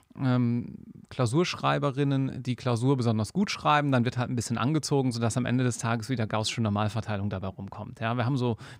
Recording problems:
none

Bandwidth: 15.5 kHz